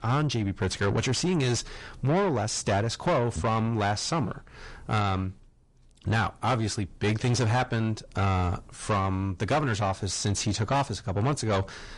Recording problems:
distortion; heavy; 6 dB below the speech
garbled, watery; slightly; nothing above 10.5 kHz

